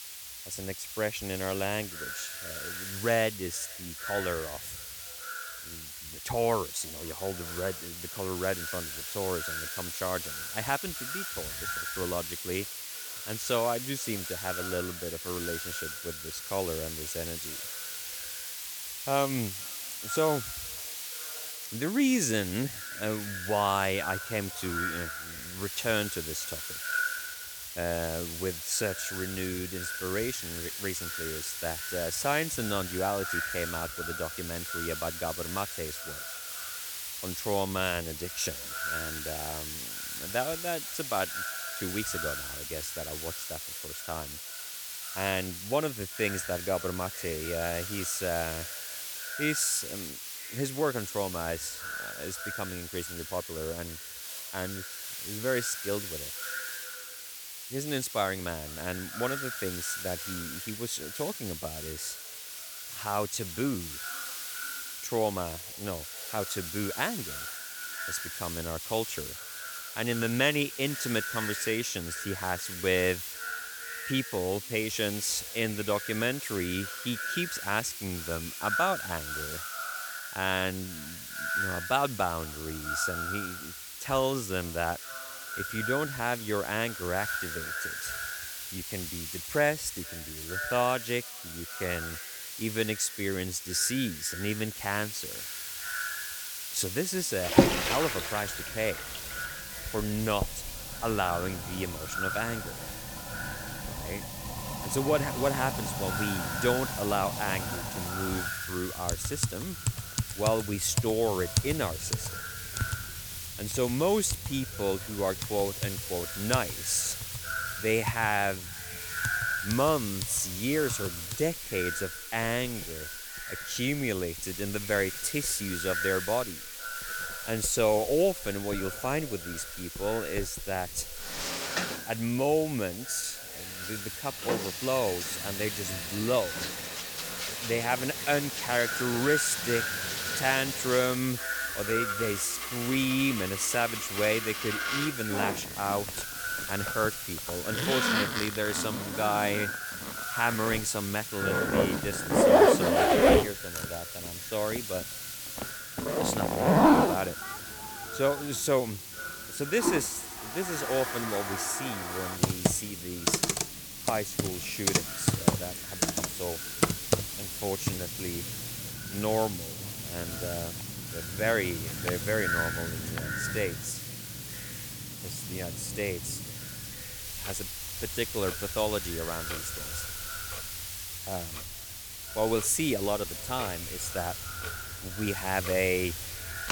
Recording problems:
echo of what is said; strong; throughout; 460 ms later, 8 dB below the speech
household noises; loud; from 1:38 on; as loud as the speech
hiss; loud; throughout; 5 dB below the speech

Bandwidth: 19 kHz